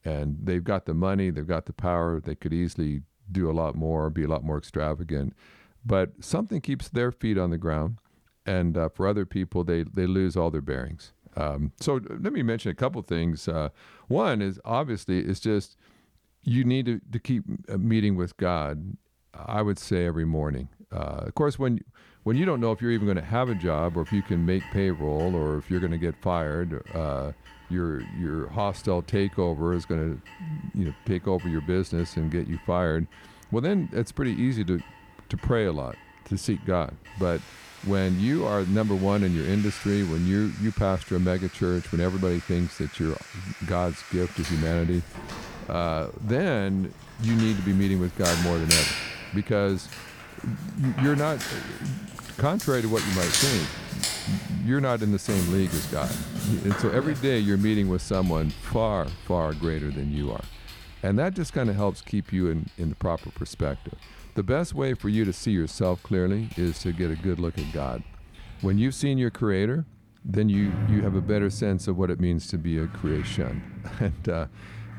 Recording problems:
household noises; loud; from 22 s on; 7 dB below the speech

